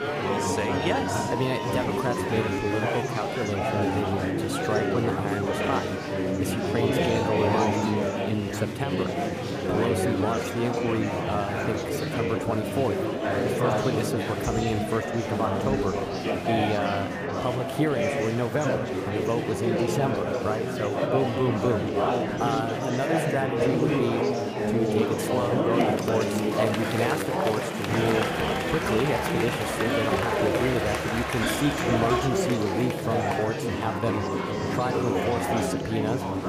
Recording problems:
chatter from many people; very loud; throughout; 3 dB above the speech

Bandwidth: 15 kHz